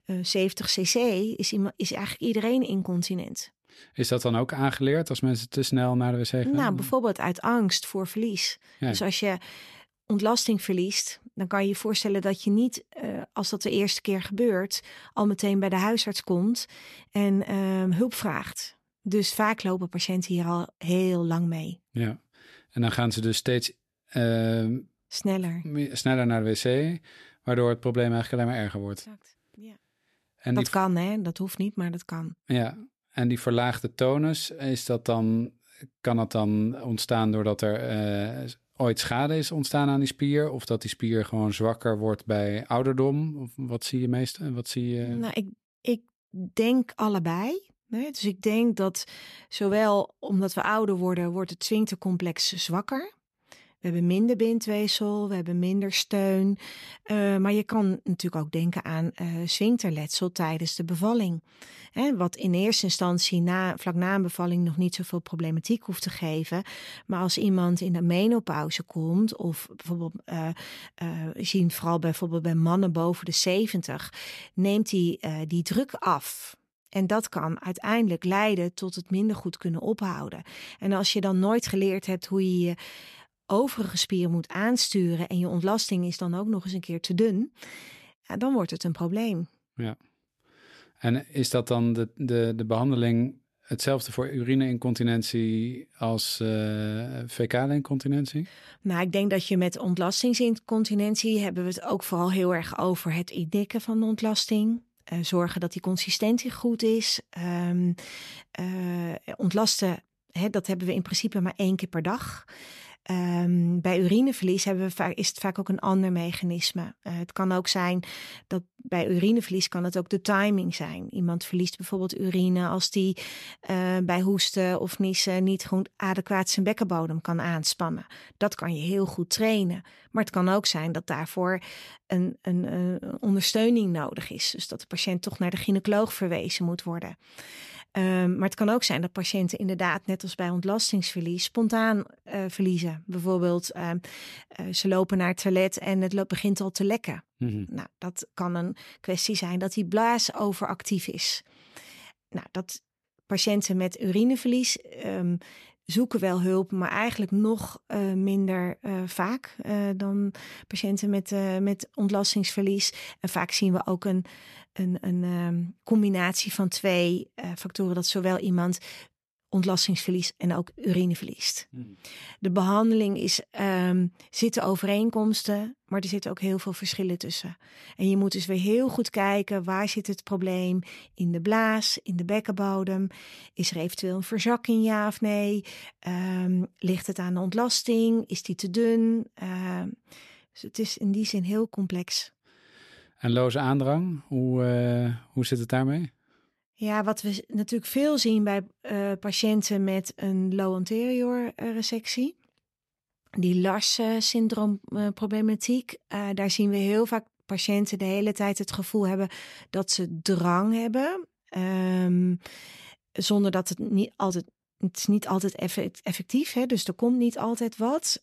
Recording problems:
none

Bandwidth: 13.5 kHz